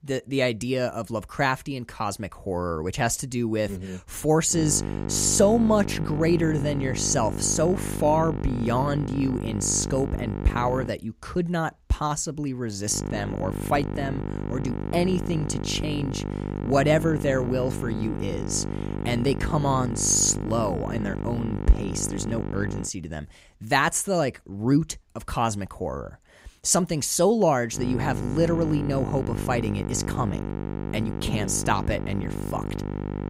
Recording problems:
electrical hum; loud; from 4.5 to 11 s, from 13 to 23 s and from 28 s on; 50 Hz, 10 dB below the speech

